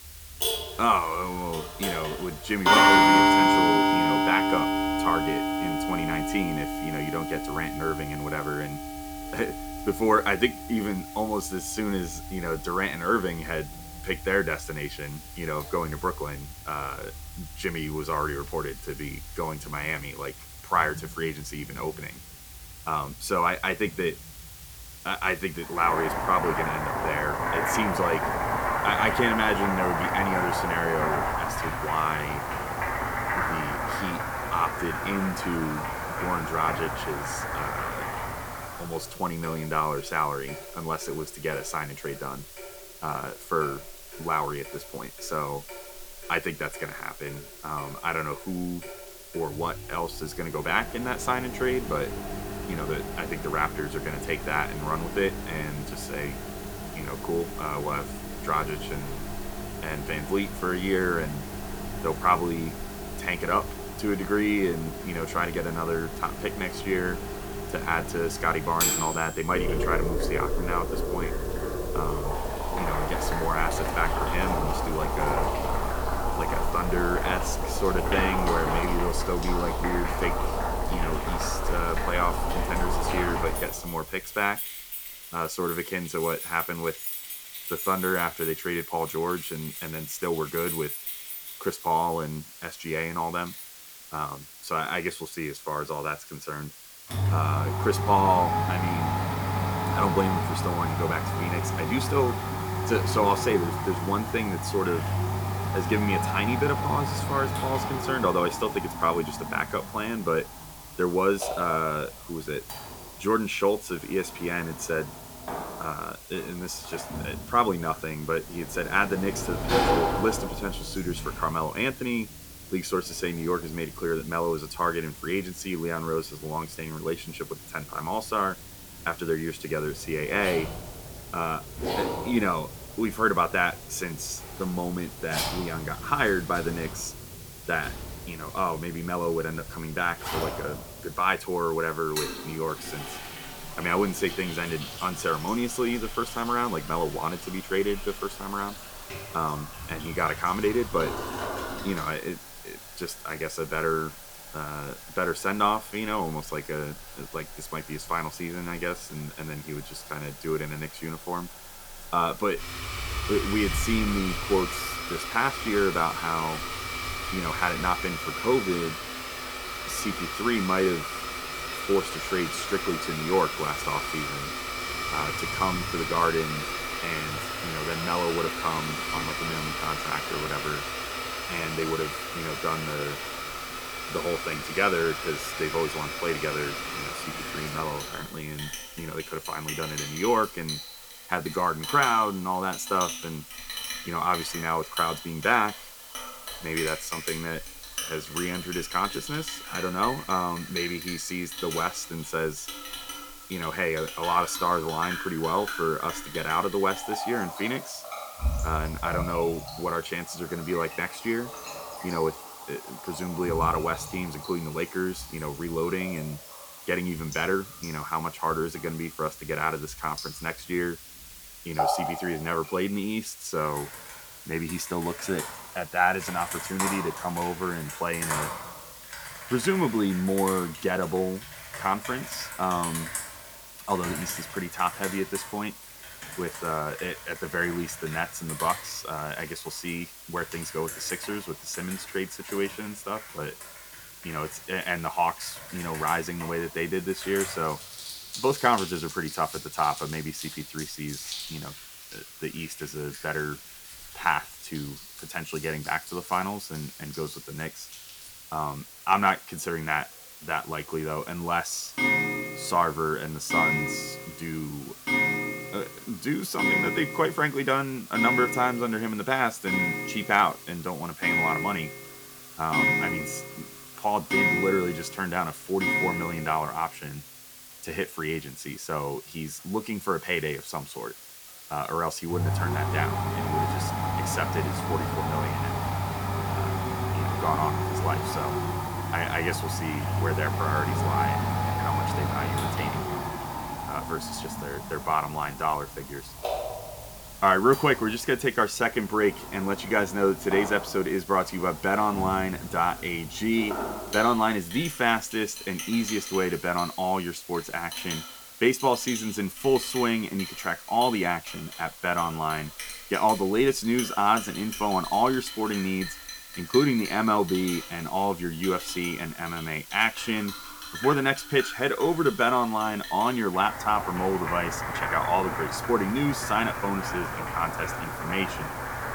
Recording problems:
household noises; loud; throughout; 2 dB below the speech
hiss; noticeable; throughout; 15 dB below the speech

